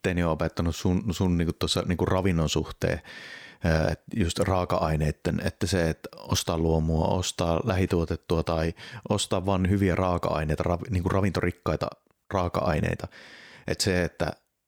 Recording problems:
none

